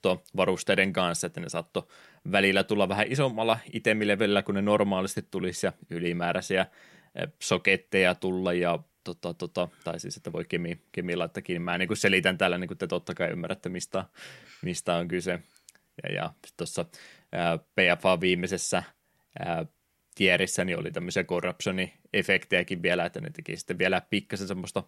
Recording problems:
none

